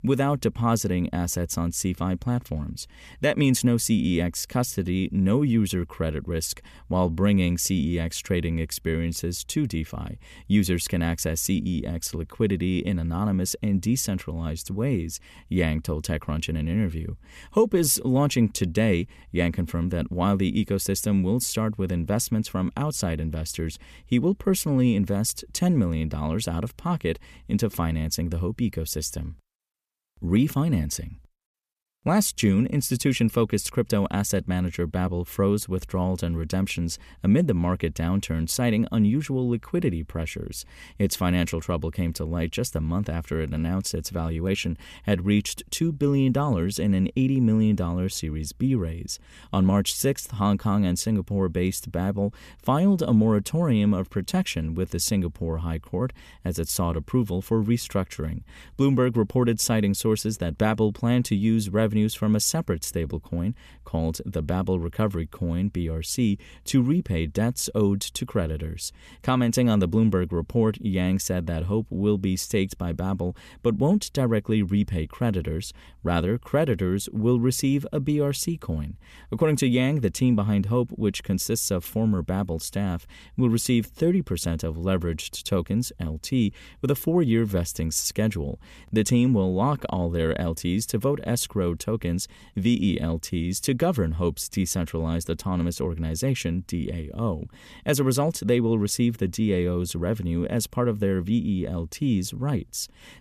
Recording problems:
none

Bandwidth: 14.5 kHz